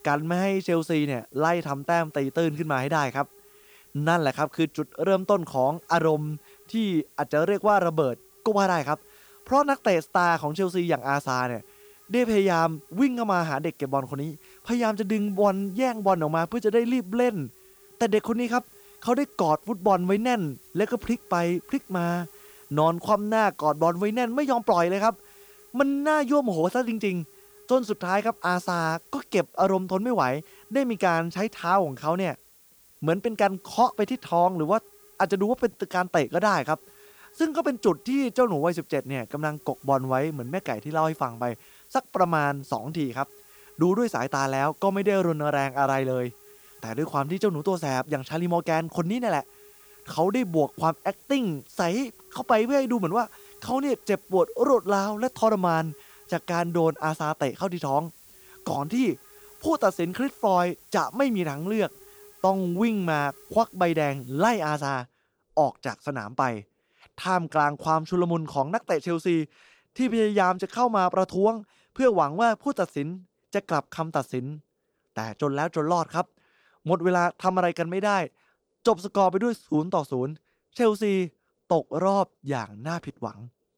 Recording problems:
hiss; faint; until 1:05; 25 dB below the speech

